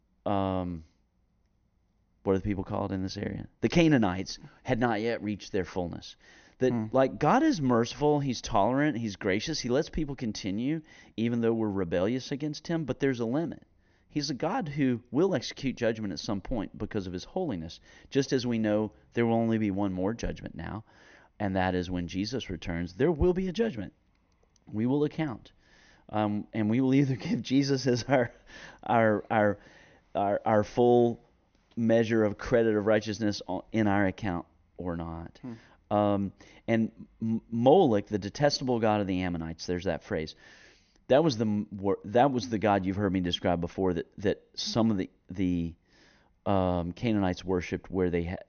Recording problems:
high frequencies cut off; noticeable; nothing above 6.5 kHz

